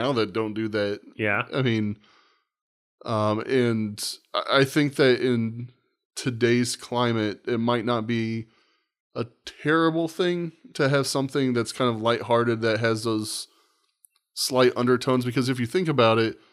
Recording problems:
abrupt cut into speech; at the start

